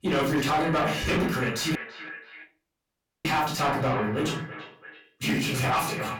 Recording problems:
distortion; heavy; 7 dB below the speech
echo of what is said; strong; throughout; 330 ms later, 10 dB below the speech
off-mic speech; far
room echo; slight; dies away in 0.3 s
audio cutting out; at 2 s for 1.5 s

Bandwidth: 17.5 kHz